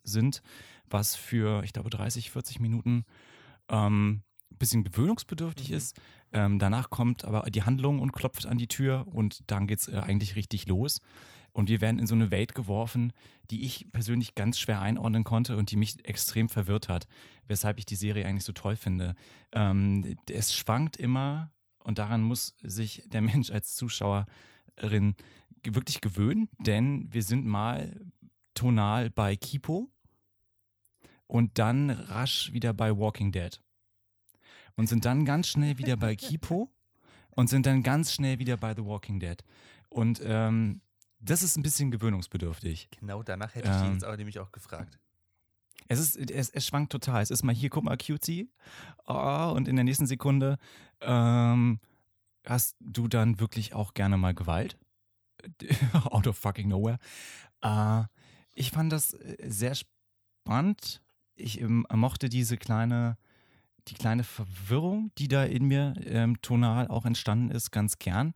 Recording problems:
none

